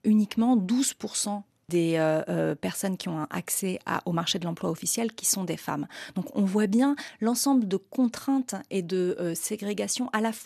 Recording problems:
none

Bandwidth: 13.5 kHz